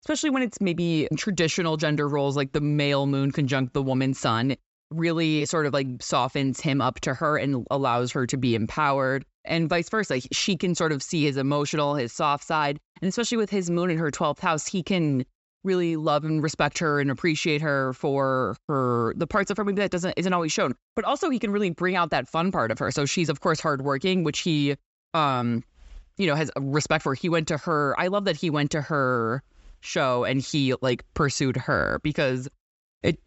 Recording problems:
high frequencies cut off; noticeable; nothing above 7.5 kHz

